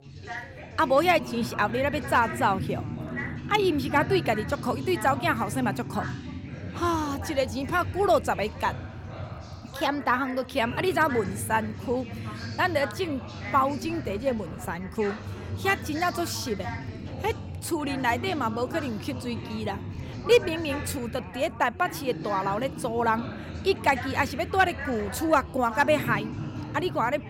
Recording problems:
background chatter; loud; throughout; 4 voices, 9 dB below the speech

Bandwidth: 16.5 kHz